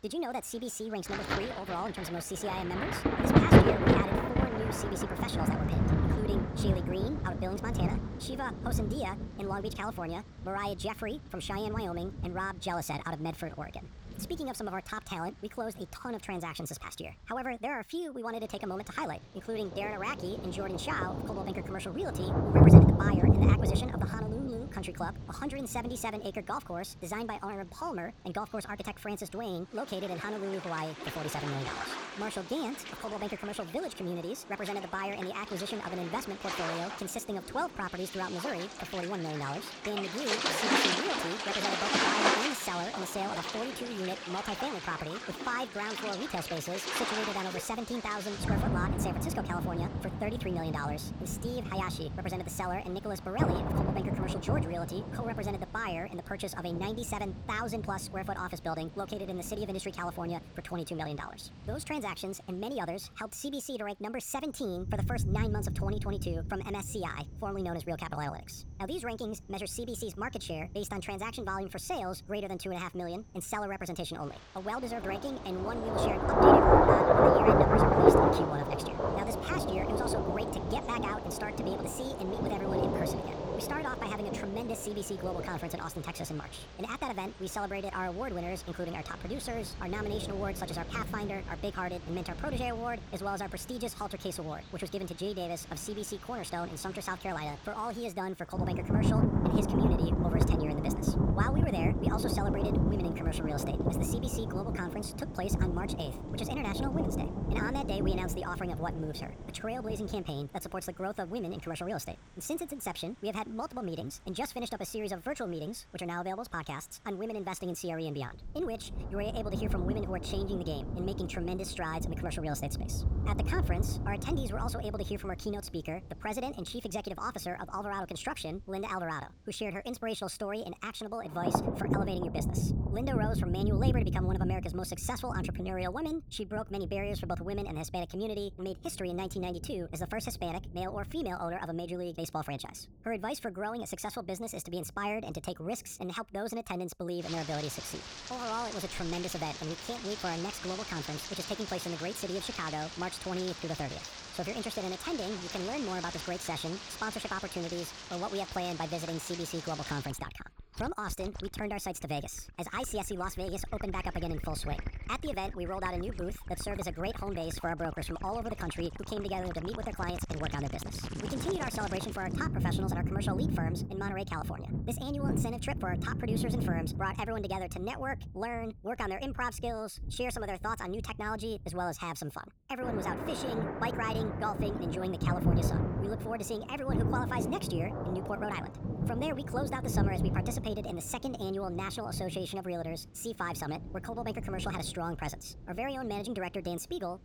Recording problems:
wrong speed and pitch; too fast and too high; 1.5 times normal speed
rain or running water; very loud; throughout; 5 dB above the speech

